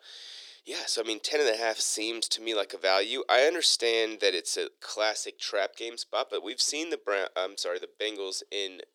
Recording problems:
thin; very; fading below 350 Hz

